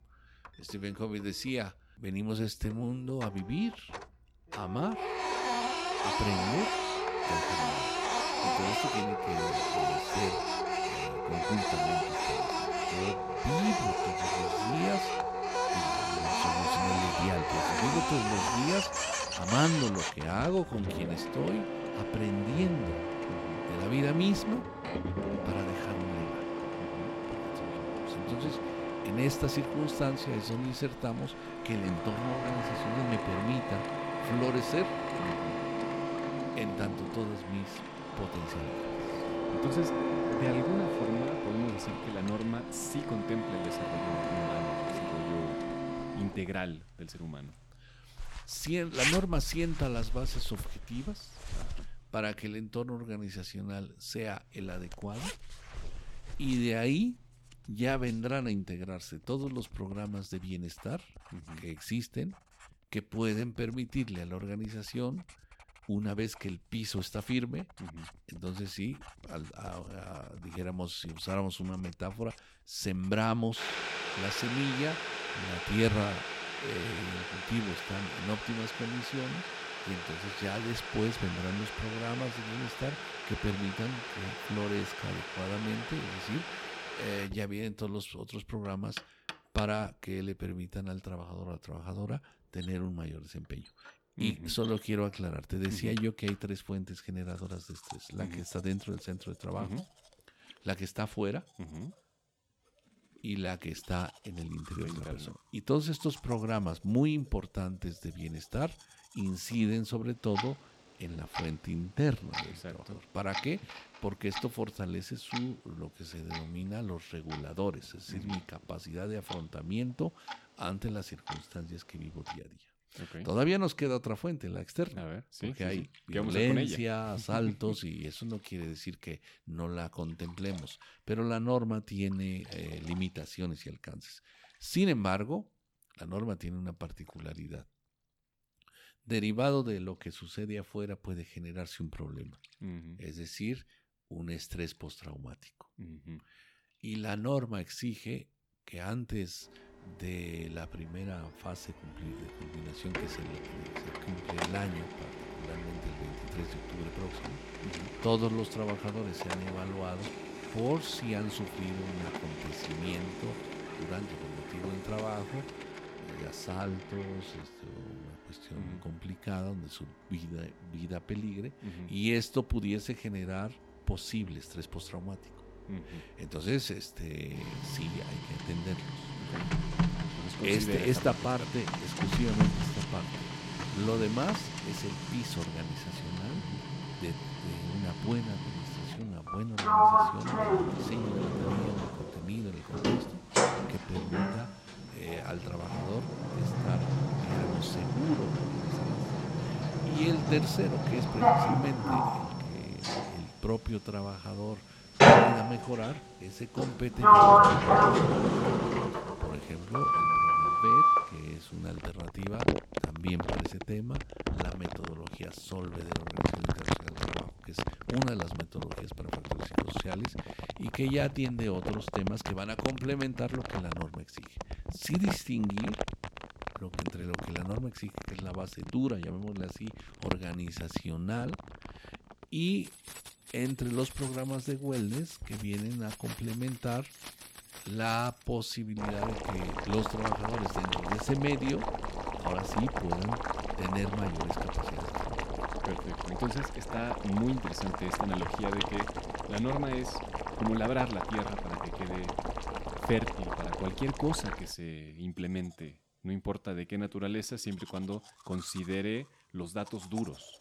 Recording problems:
household noises; very loud; throughout; 4 dB above the speech

